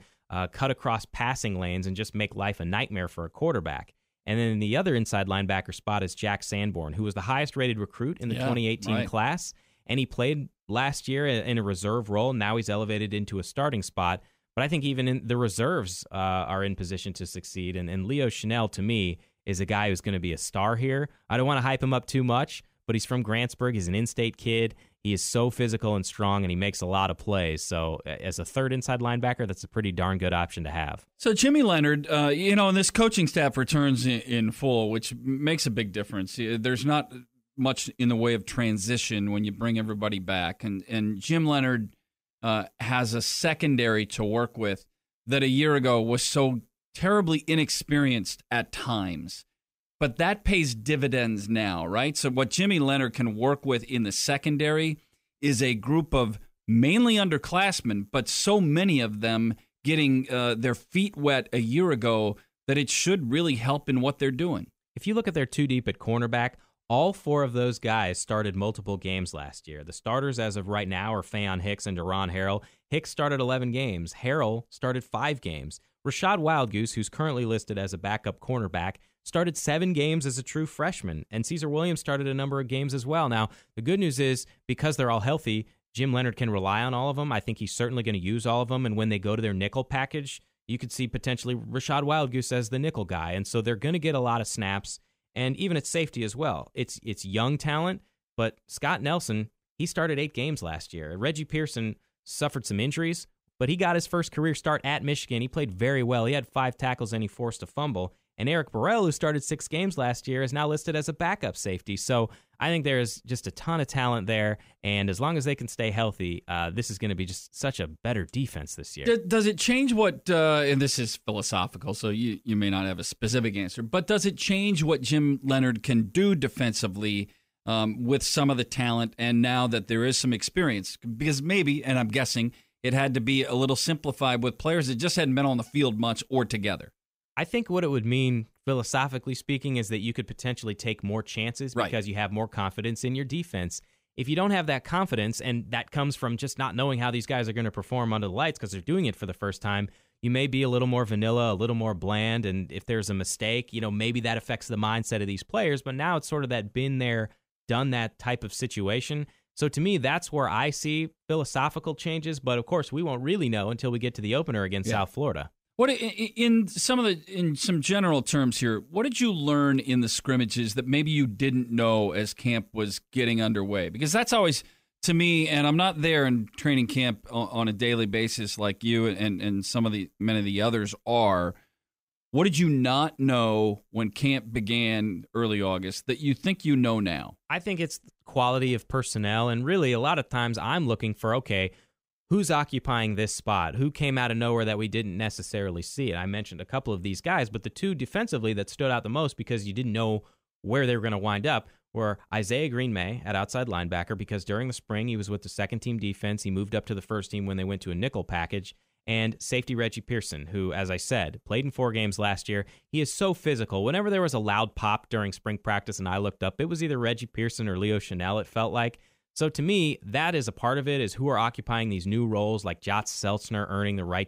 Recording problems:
none

